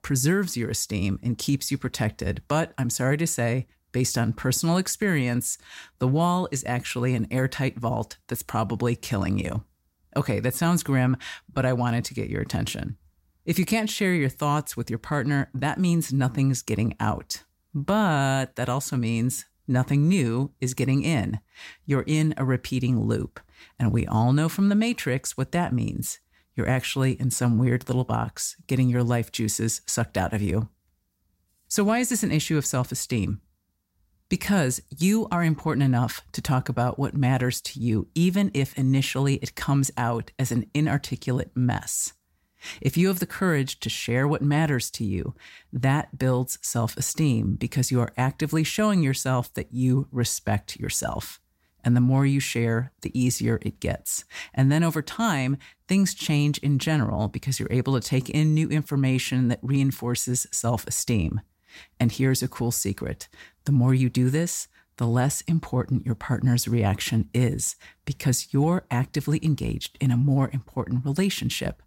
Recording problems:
none

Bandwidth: 16 kHz